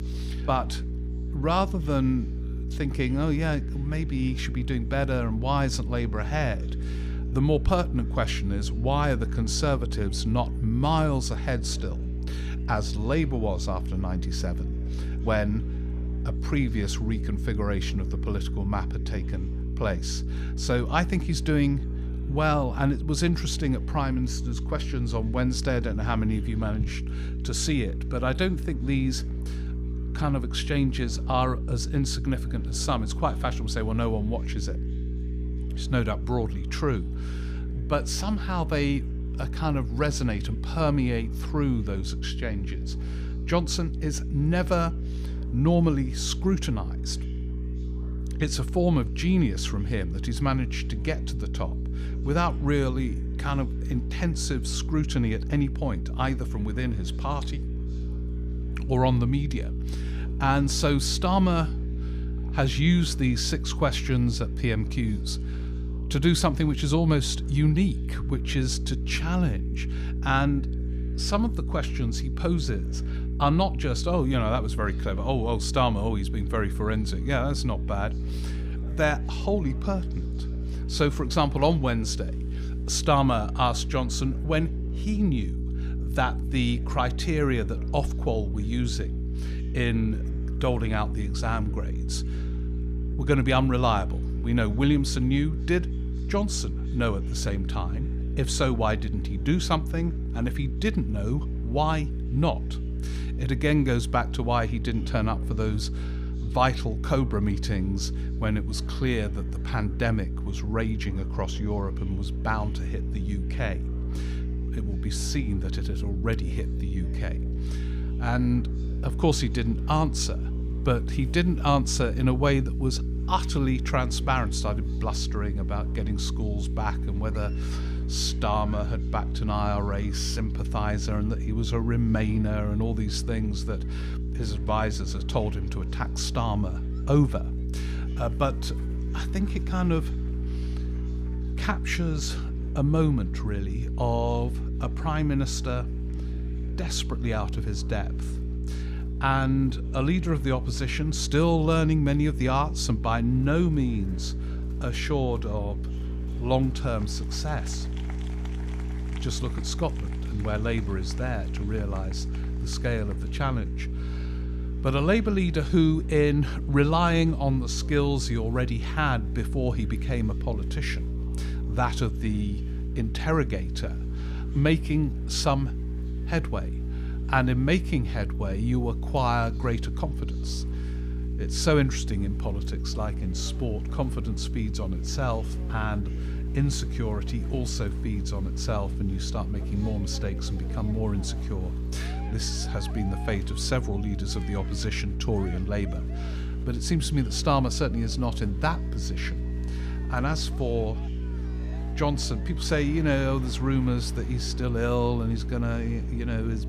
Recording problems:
electrical hum; noticeable; throughout; 60 Hz, 15 dB below the speech
chatter from many people; faint; throughout; 25 dB below the speech

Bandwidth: 15 kHz